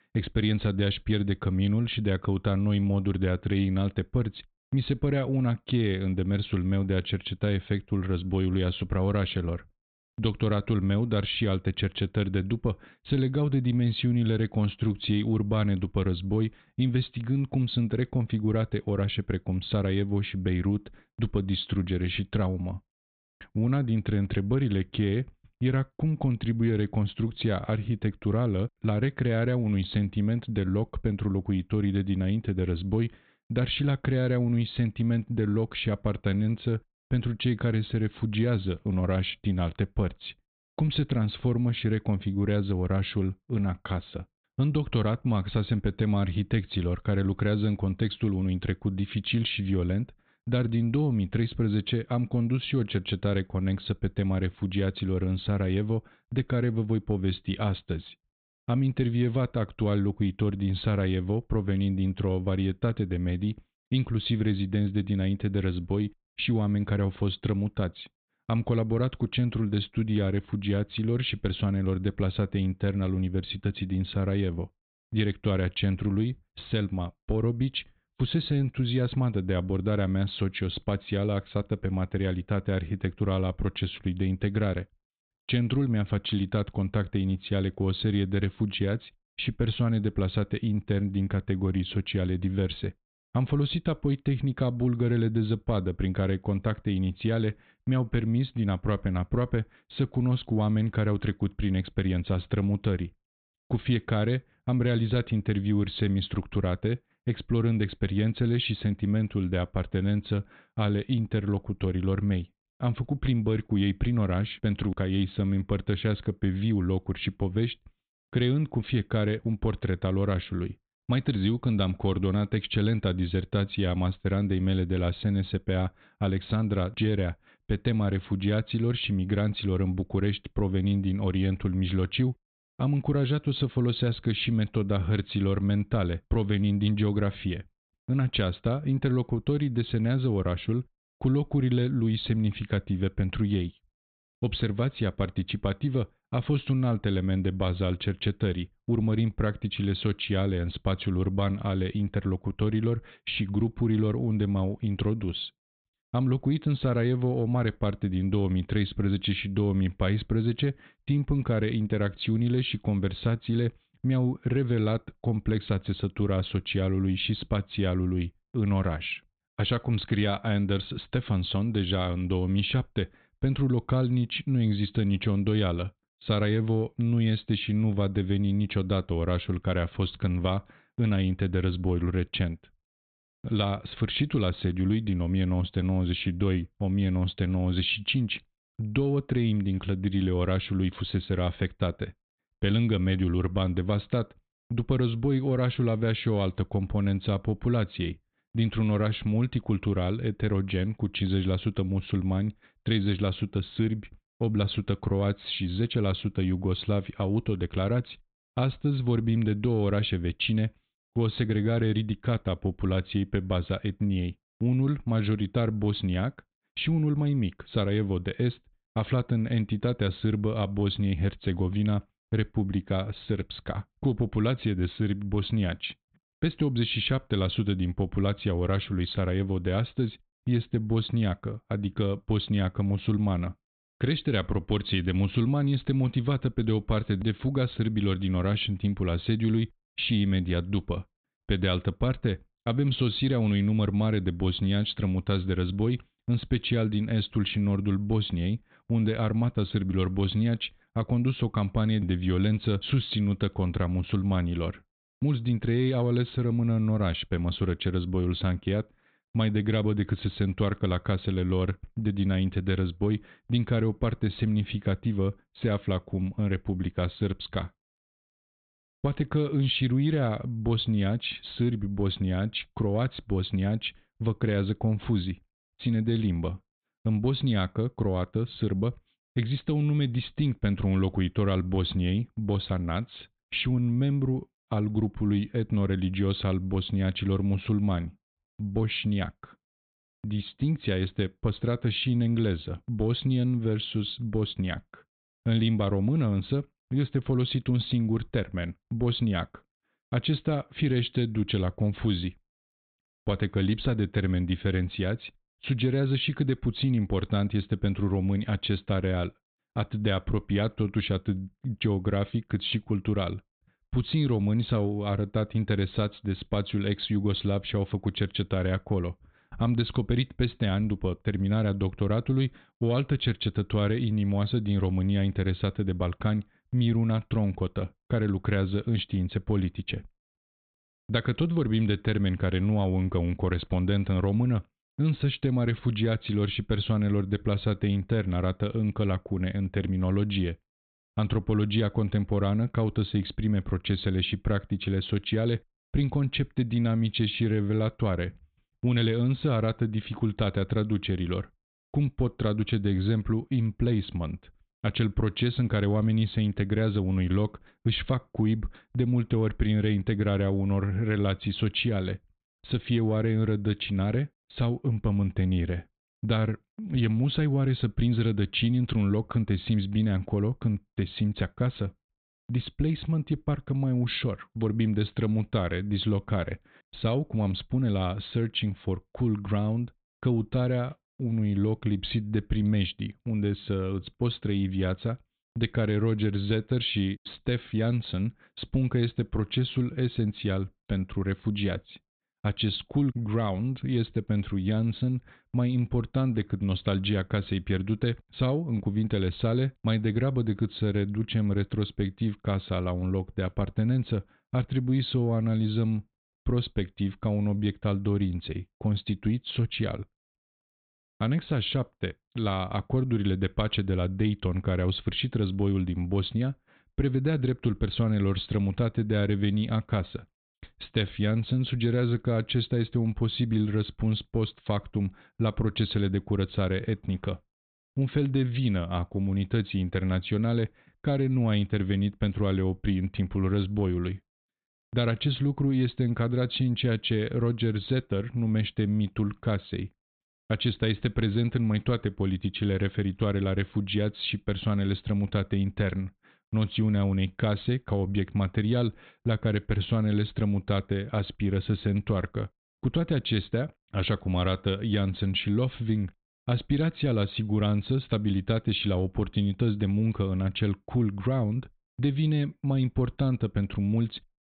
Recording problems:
high frequencies cut off; severe; nothing above 4 kHz

